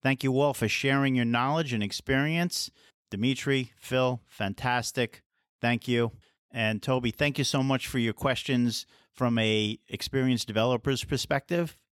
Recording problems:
none

